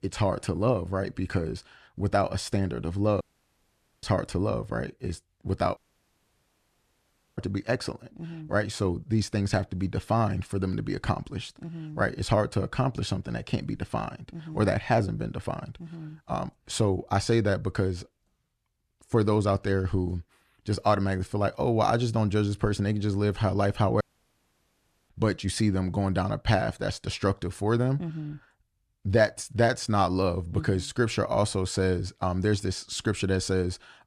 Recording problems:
audio cutting out; at 3 s for 1 s, at 6 s for 1.5 s and at 24 s for 1 s

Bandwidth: 13.5 kHz